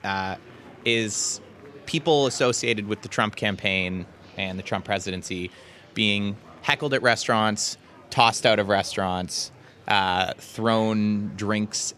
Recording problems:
murmuring crowd; faint; throughout; 25 dB below the speech

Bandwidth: 14.5 kHz